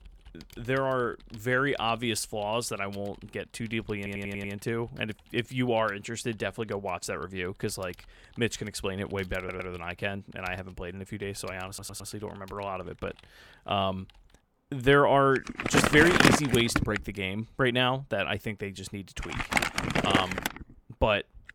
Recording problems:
household noises; very loud; throughout; 3 dB above the speech
audio stuttering; at 4 s, at 9.5 s and at 12 s

